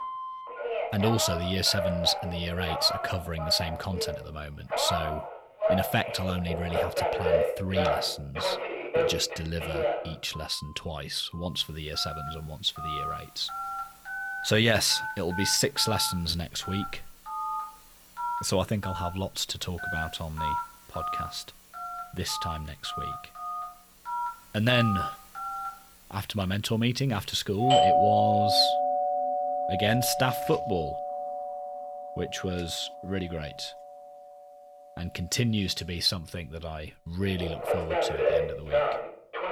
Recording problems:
alarms or sirens; loud; throughout; 2 dB below the speech

